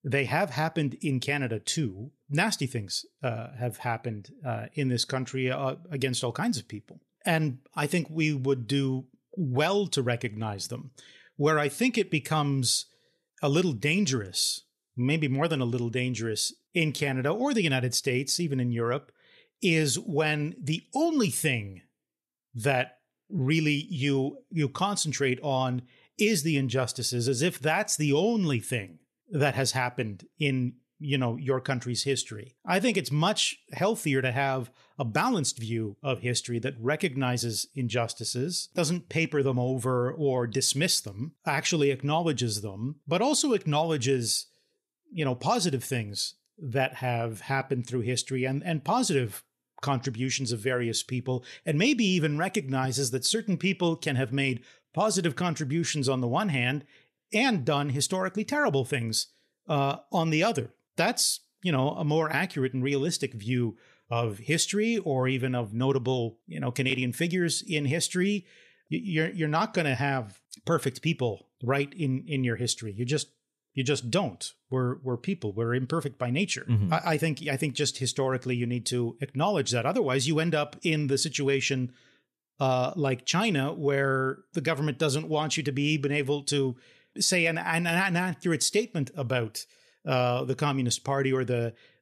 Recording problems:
none

